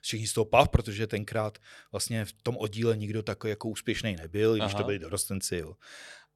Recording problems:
none

